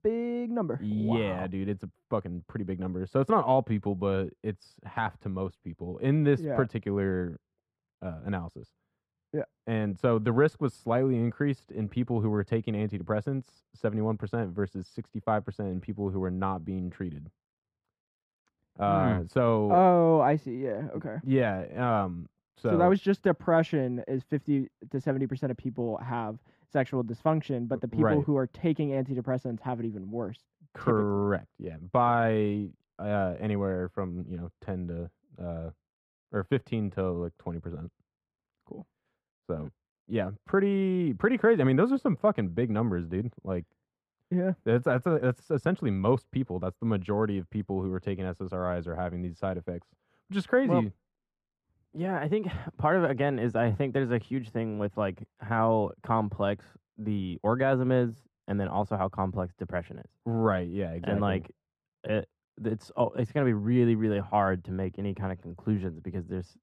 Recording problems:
muffled; very; fading above 3 kHz

